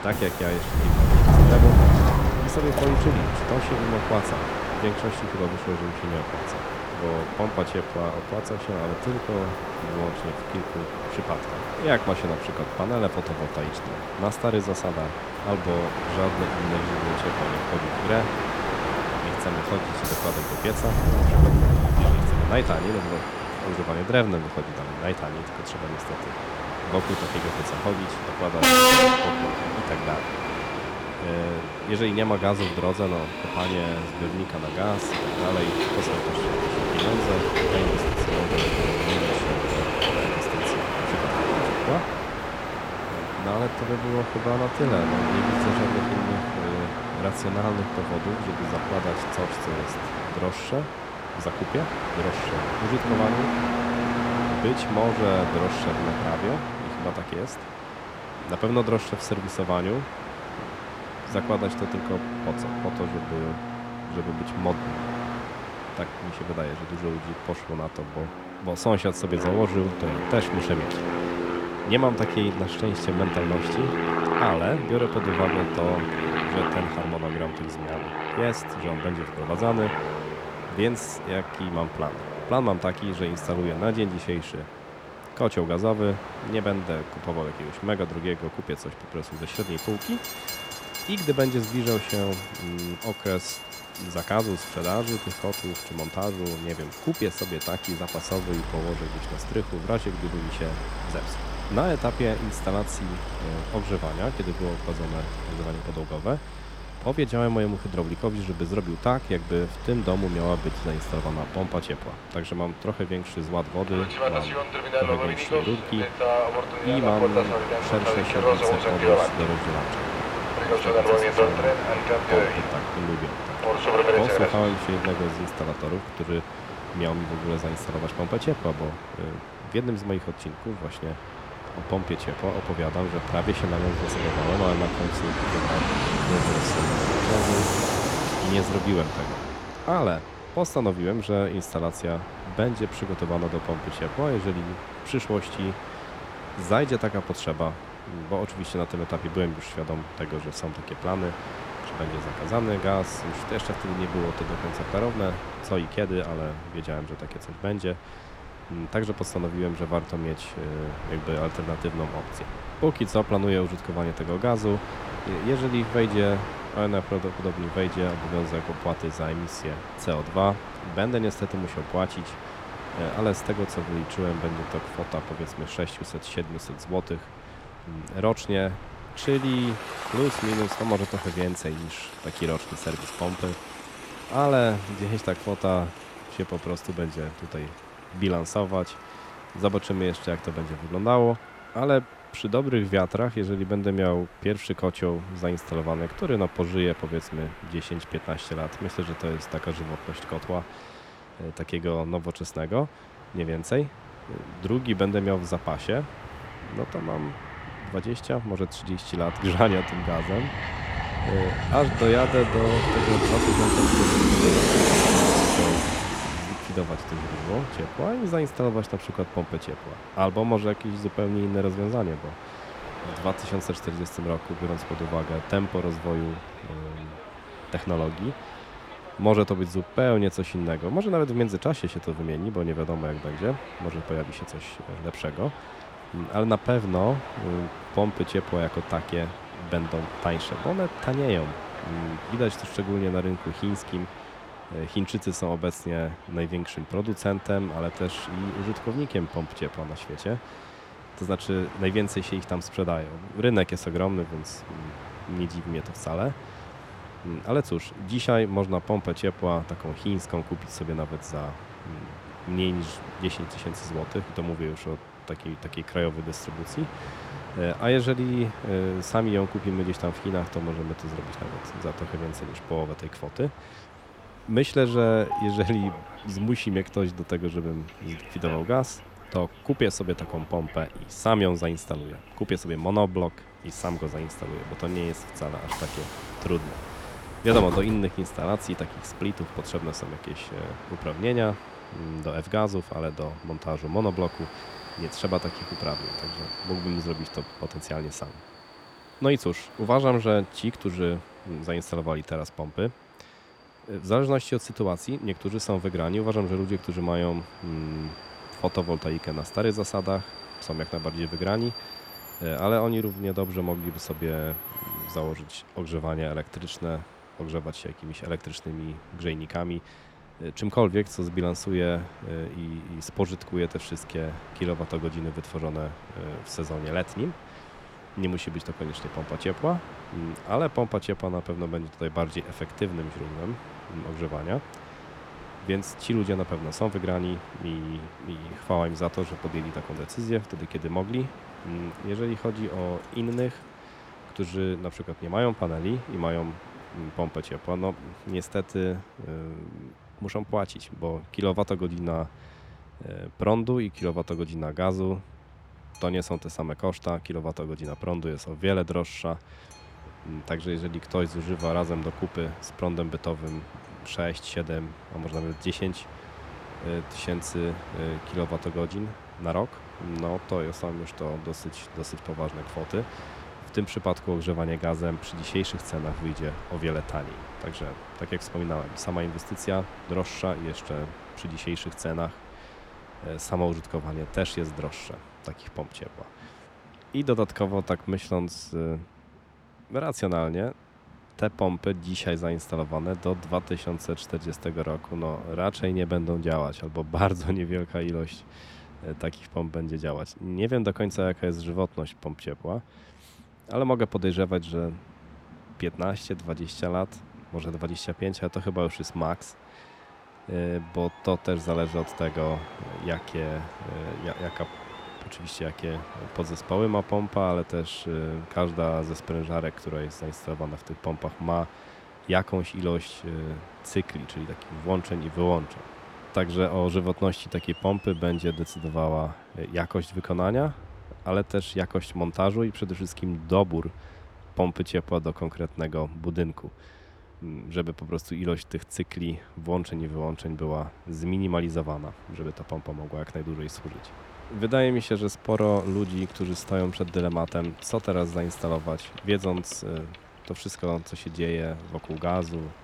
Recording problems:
train or aircraft noise; loud; throughout; as loud as the speech

